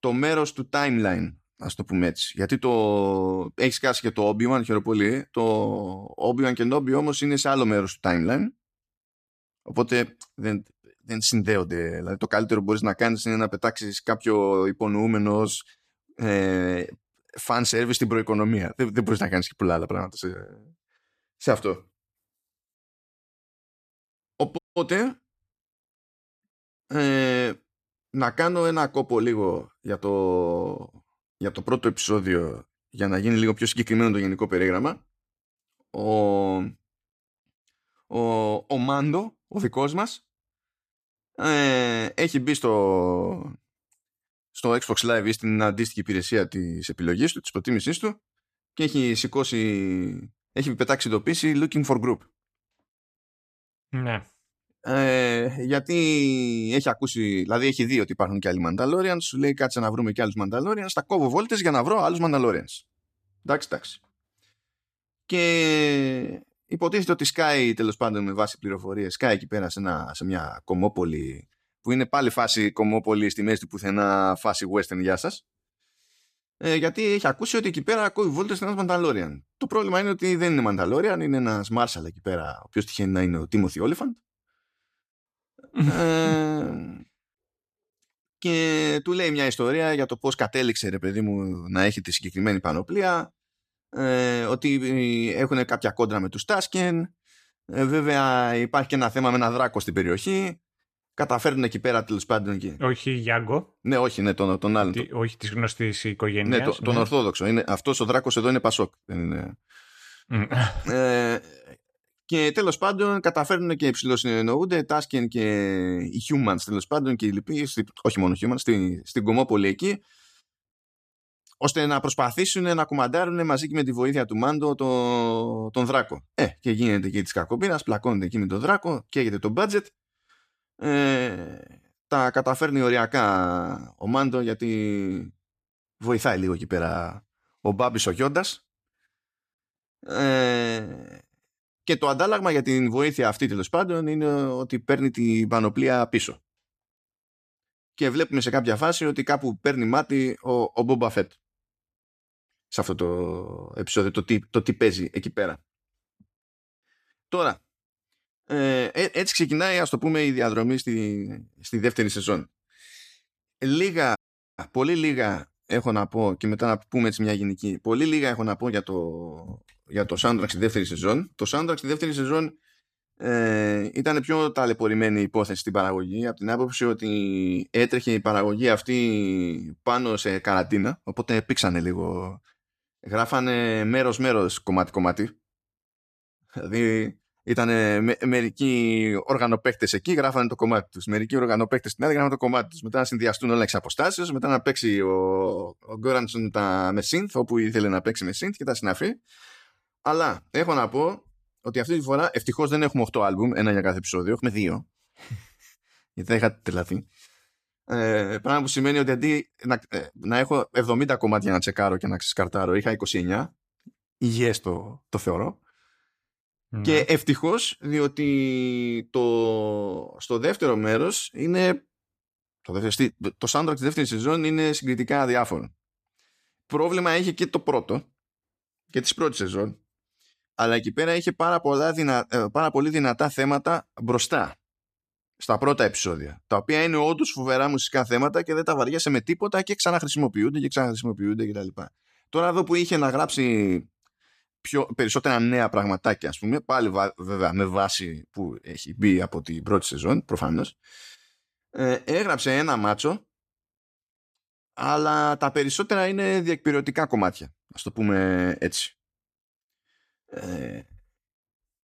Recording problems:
audio cutting out; at 25 s and at 2:44

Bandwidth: 14.5 kHz